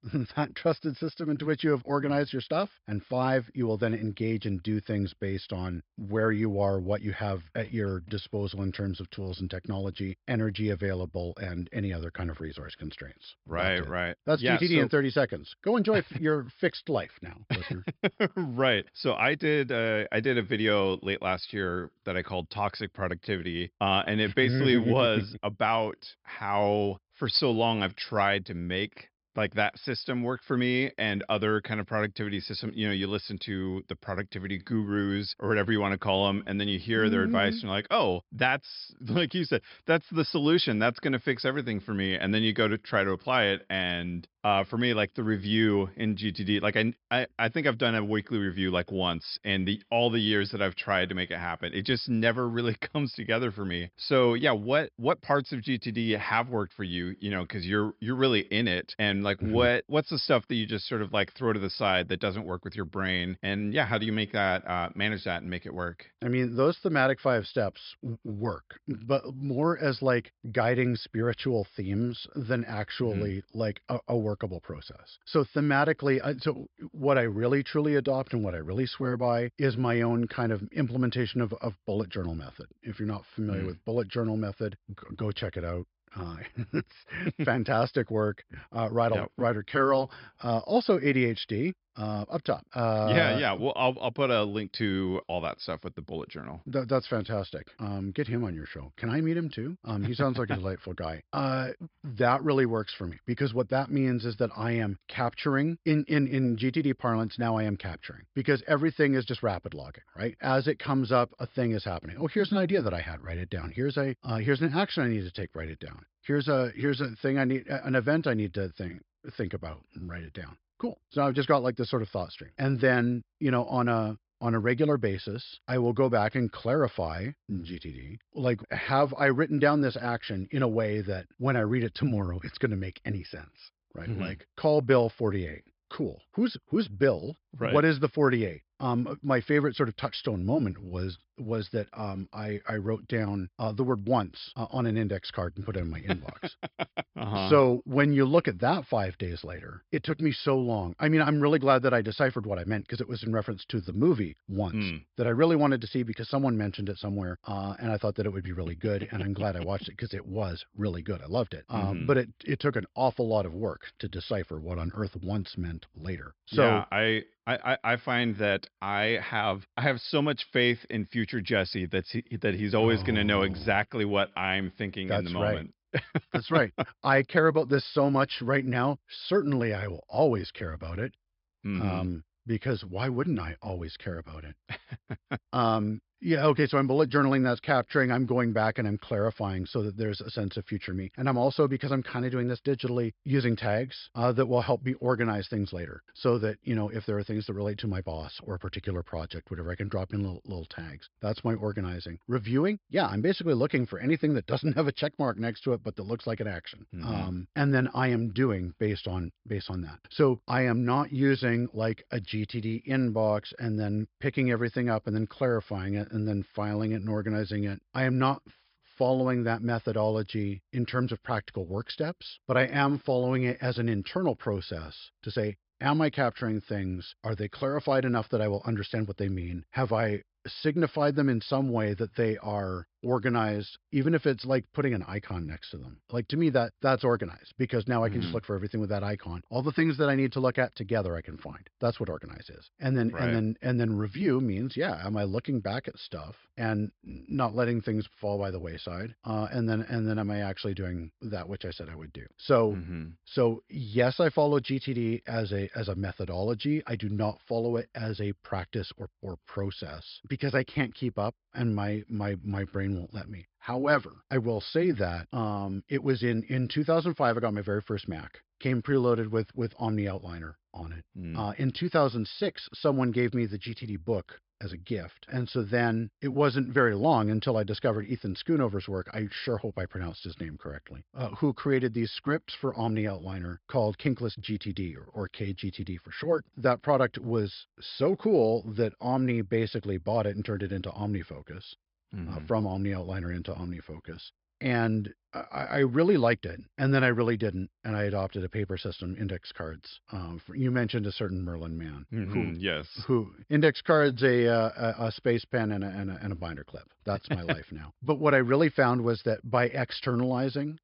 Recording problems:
high frequencies cut off; noticeable; nothing above 5.5 kHz

